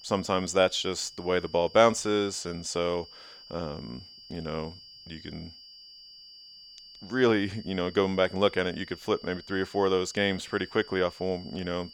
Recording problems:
high-pitched whine; noticeable; throughout; 4.5 kHz, 20 dB below the speech

